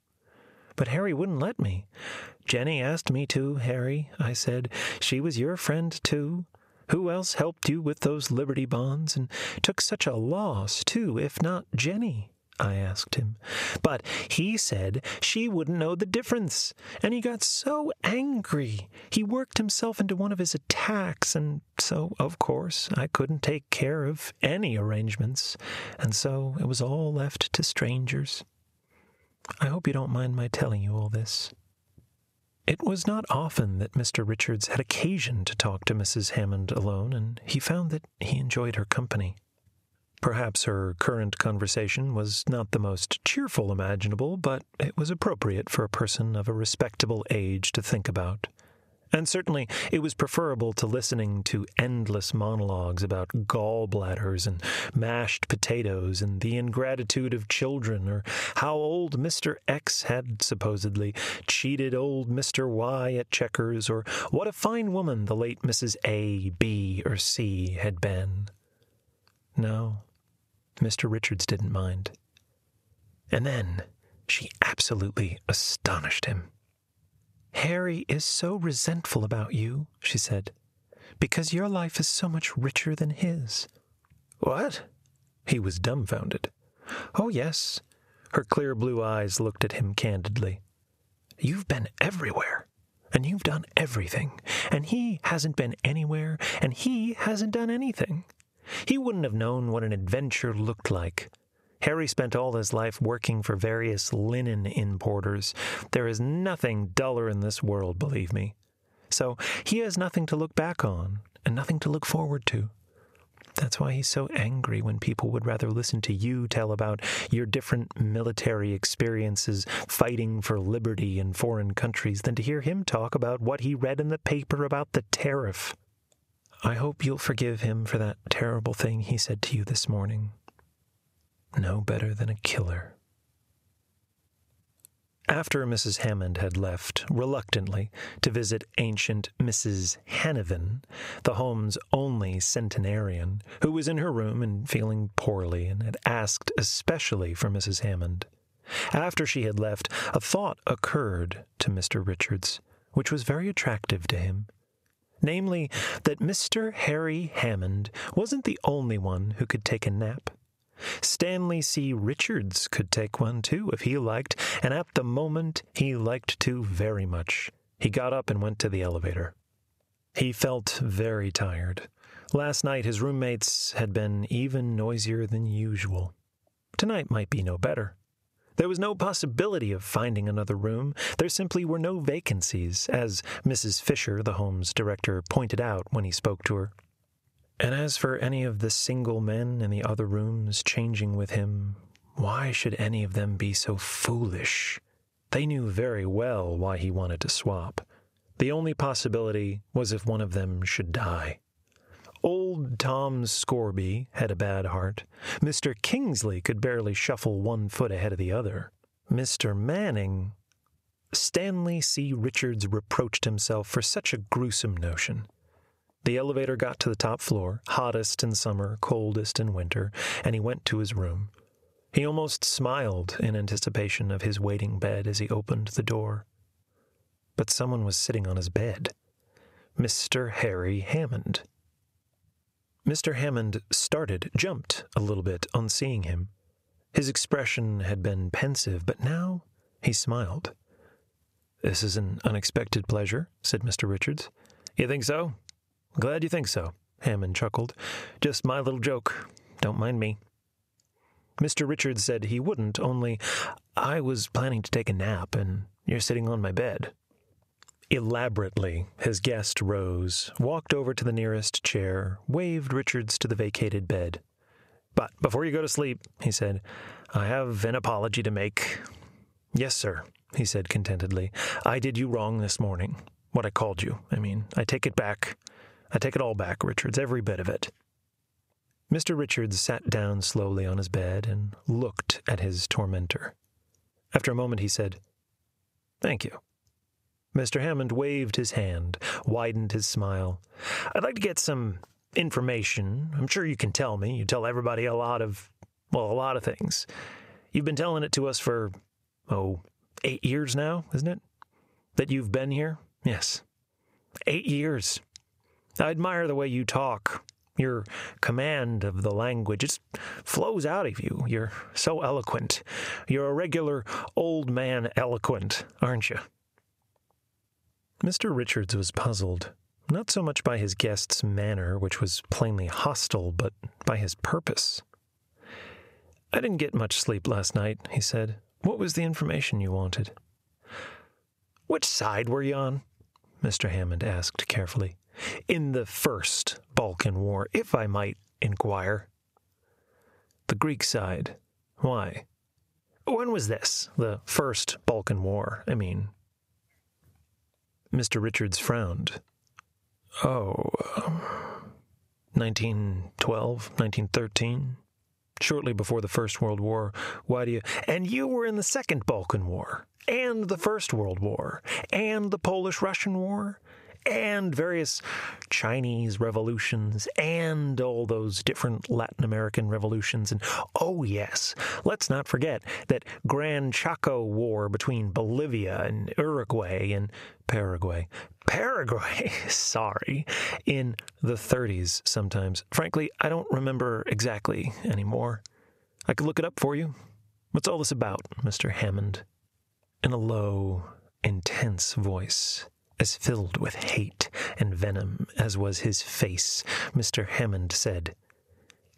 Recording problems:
squashed, flat; heavily

